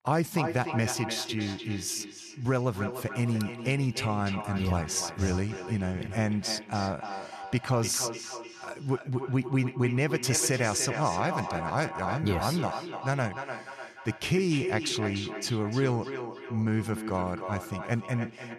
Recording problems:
echo of what is said; strong; throughout; 300 ms later, 8 dB below the speech

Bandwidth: 14 kHz